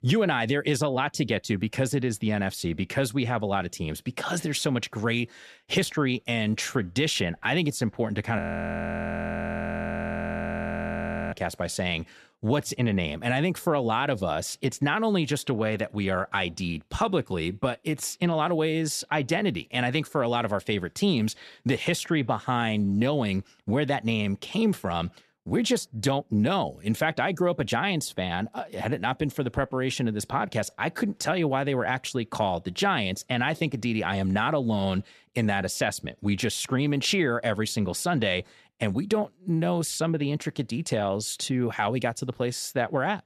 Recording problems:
audio freezing; at 8.5 s for 3 s

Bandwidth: 13.5 kHz